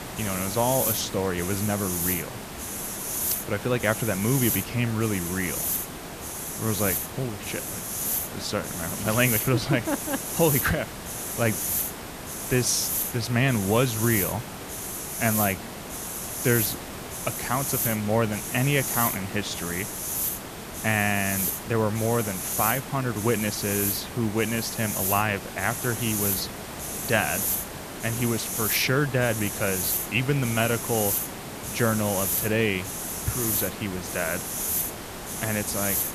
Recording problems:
hiss; loud; throughout; 2 dB below the speech

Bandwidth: 14.5 kHz